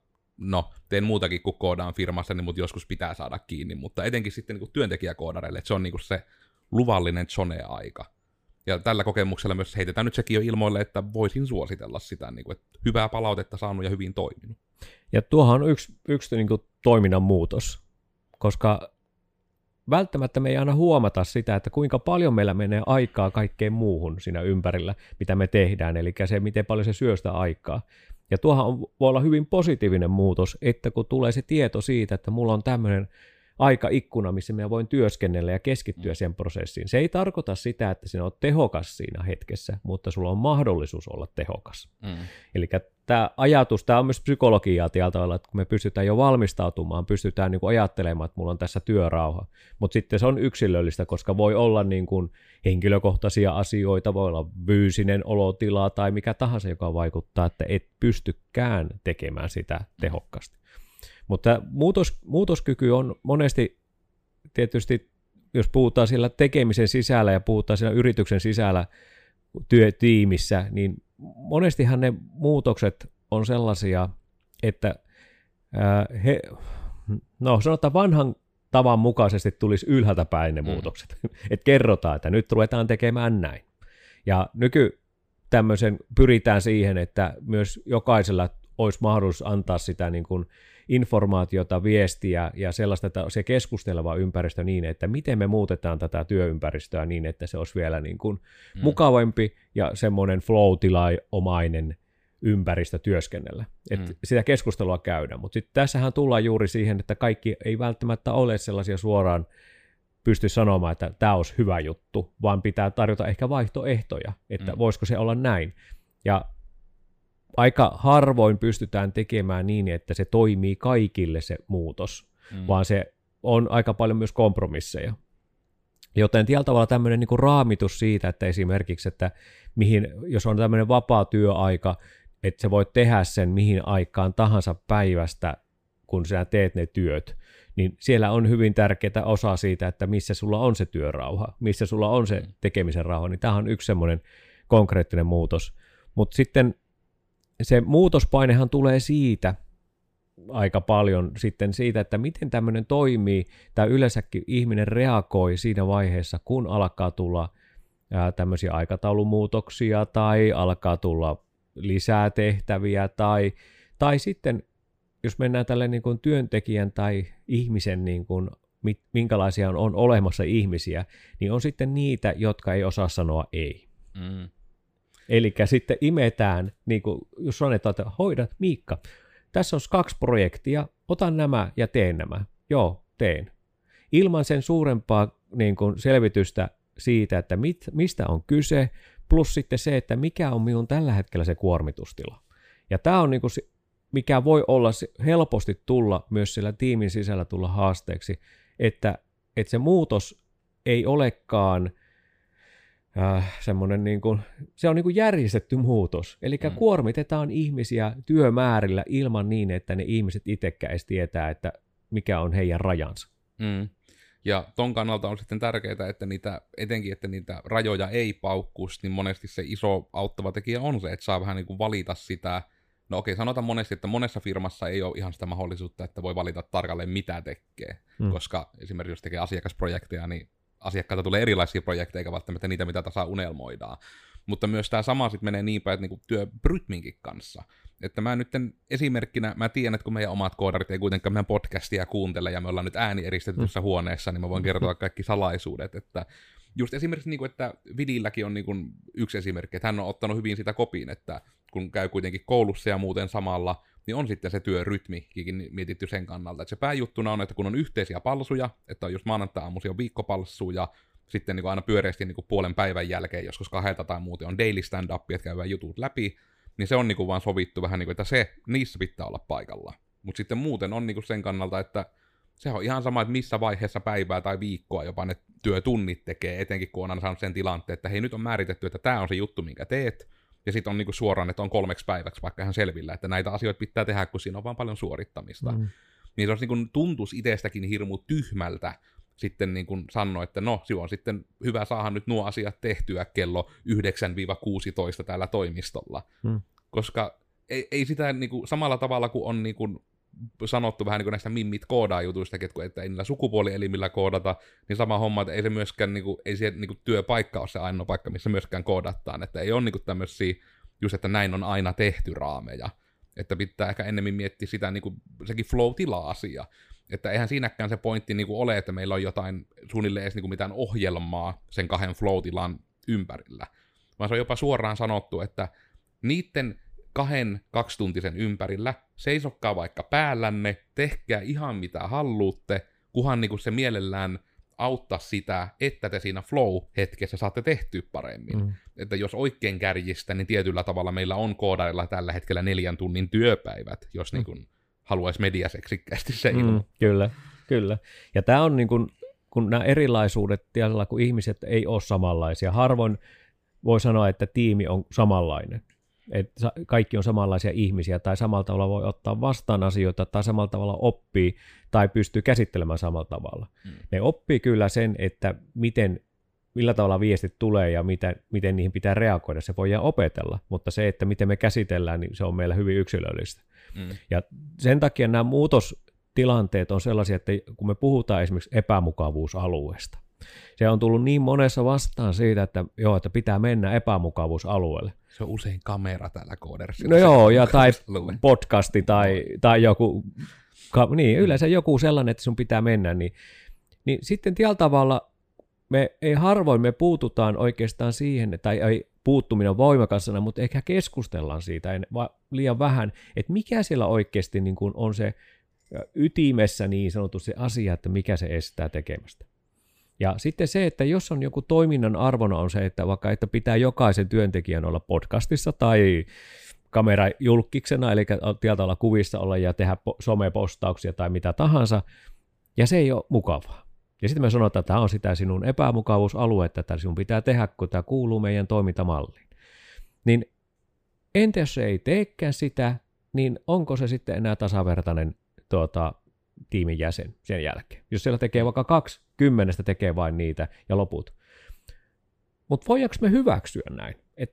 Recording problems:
none

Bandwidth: 15 kHz